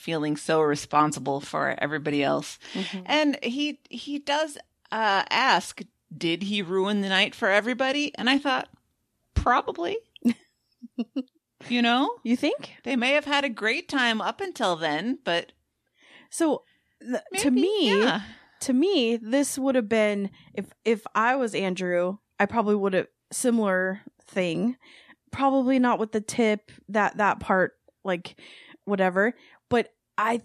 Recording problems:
none

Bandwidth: 14 kHz